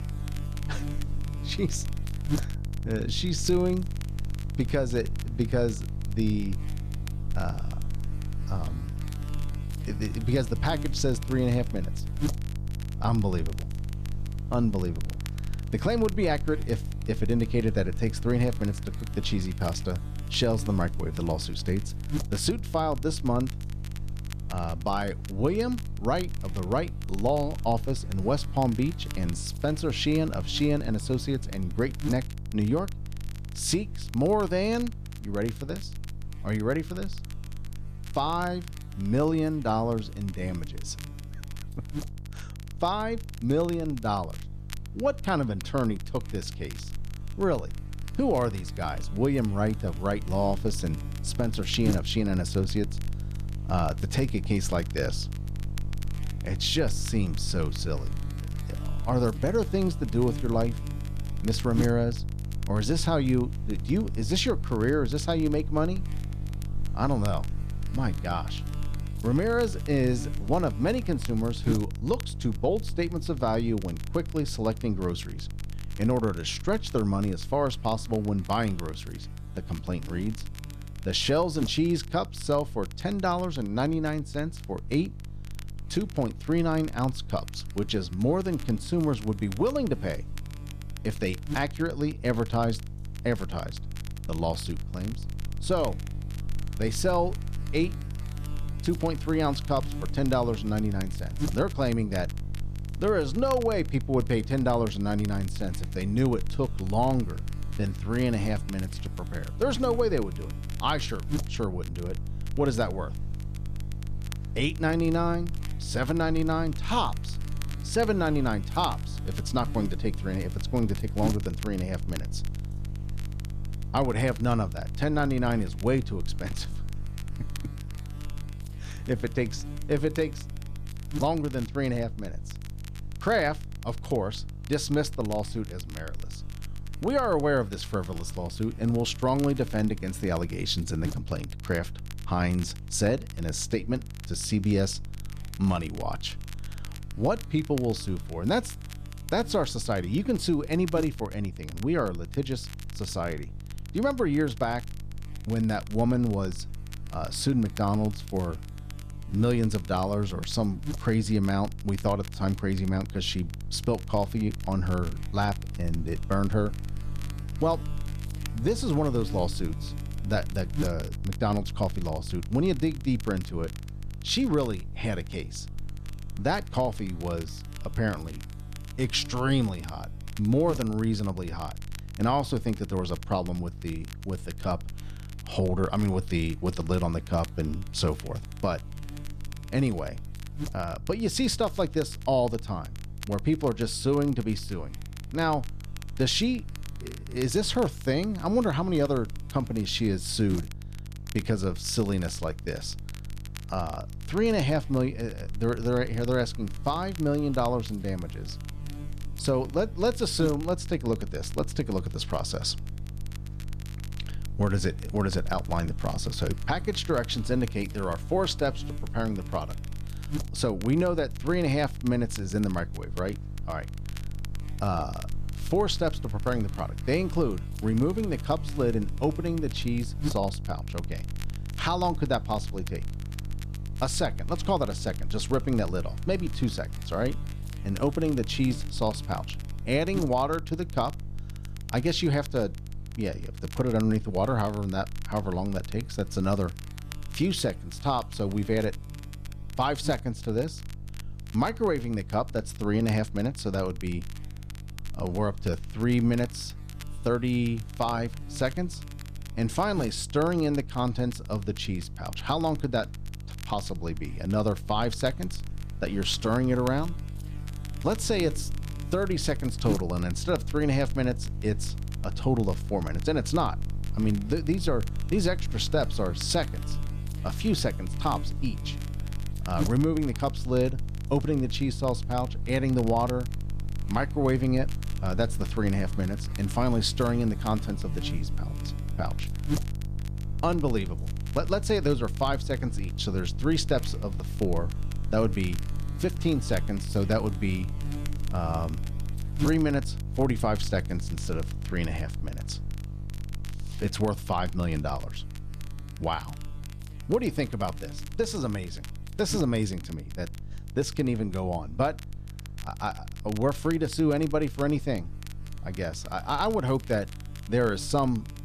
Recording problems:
electrical hum; noticeable; throughout; 50 Hz, 20 dB below the speech
crackle, like an old record; faint; 20 dB below the speech

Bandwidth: 14 kHz